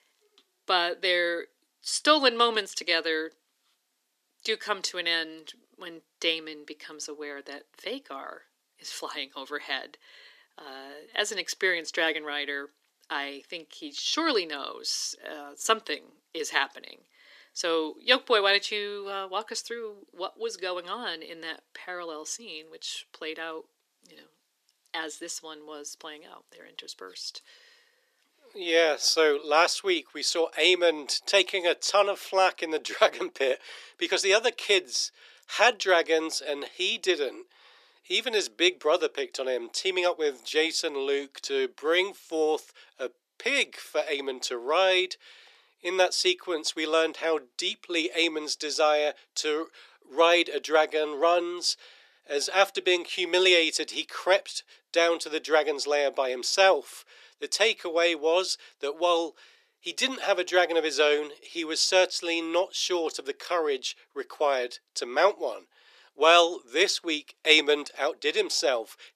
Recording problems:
thin; very; fading below 350 Hz

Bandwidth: 14.5 kHz